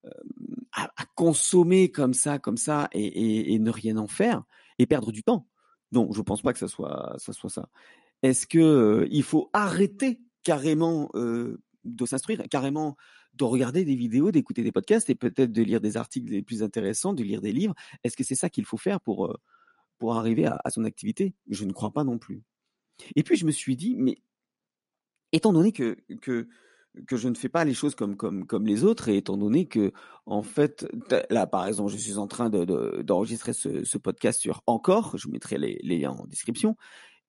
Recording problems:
garbled, watery; slightly; nothing above 11 kHz
uneven, jittery; strongly; from 1 to 31 s

